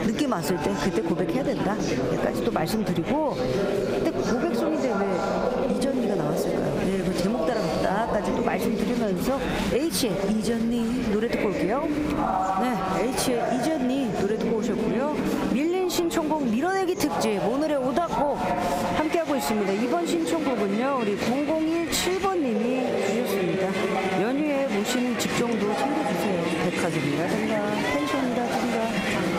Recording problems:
squashed, flat; somewhat
chatter from many people; loud; throughout; 1 dB below the speech

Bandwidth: 15.5 kHz